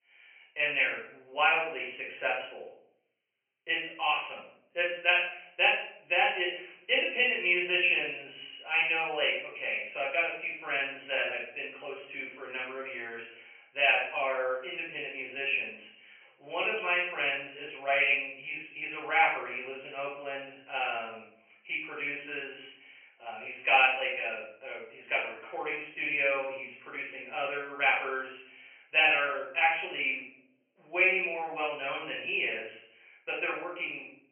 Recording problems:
off-mic speech; far
thin; very; fading below 600 Hz
high frequencies cut off; severe; nothing above 3 kHz
room echo; noticeable; dies away in 0.6 s

